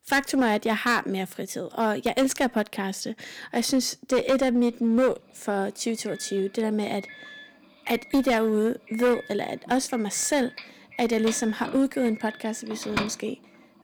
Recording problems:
distortion; slight; 7% of the sound clipped
doorbell; noticeable; from 11 to 13 s; peak 4 dB below the speech

